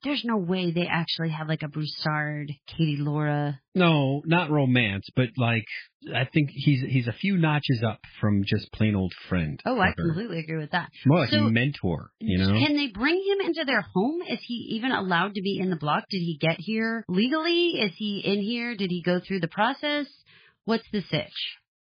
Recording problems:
garbled, watery; badly; nothing above 5 kHz

